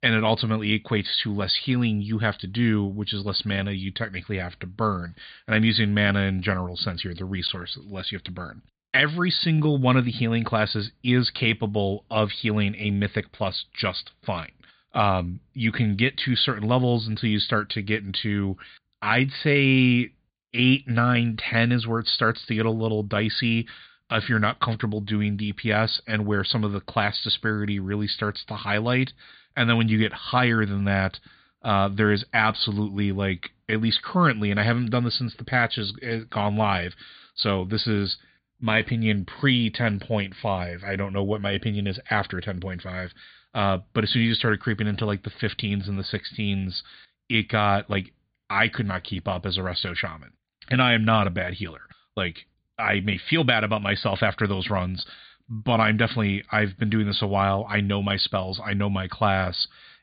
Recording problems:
high frequencies cut off; severe; nothing above 4.5 kHz

